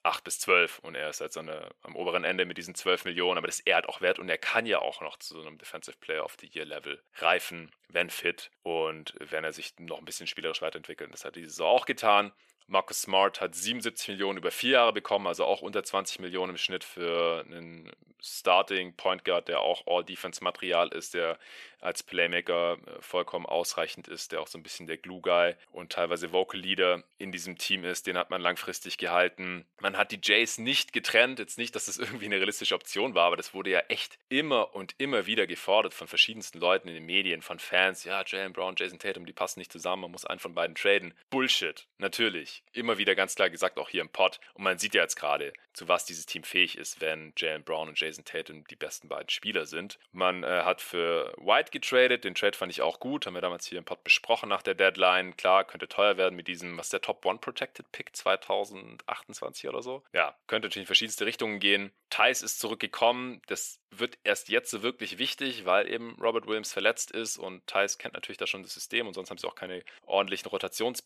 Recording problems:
thin; very; fading below 500 Hz

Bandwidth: 14.5 kHz